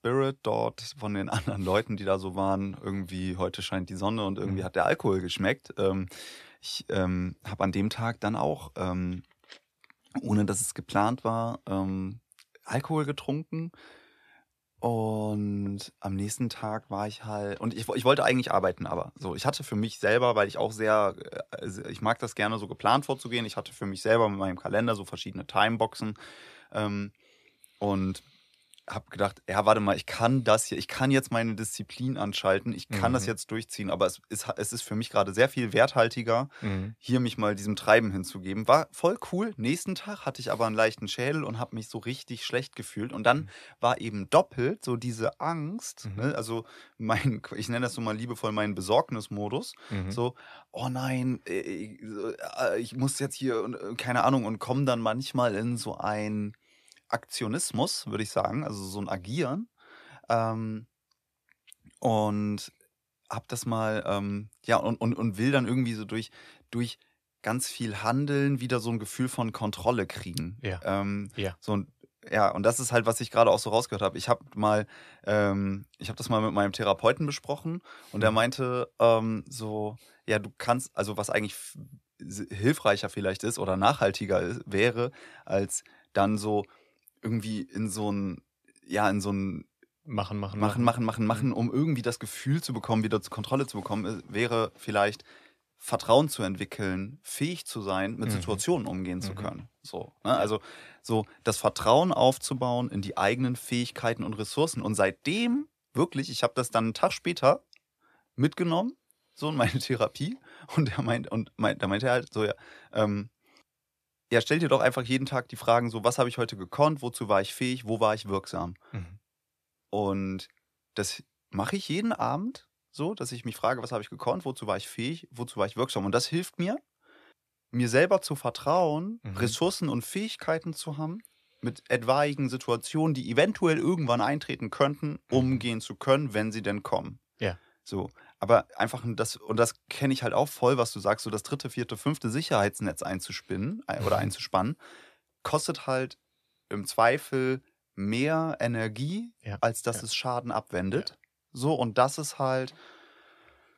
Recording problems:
none

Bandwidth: 14.5 kHz